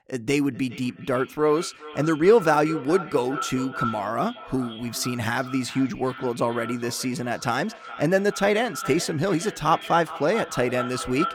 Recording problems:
echo of what is said; noticeable; throughout; 420 ms later, 10 dB below the speech

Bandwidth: 17.5 kHz